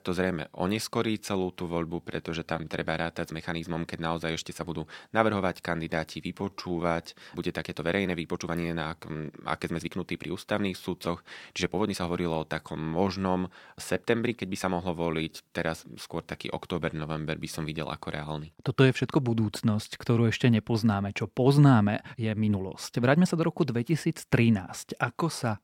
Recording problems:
uneven, jittery; strongly; from 1 to 23 s

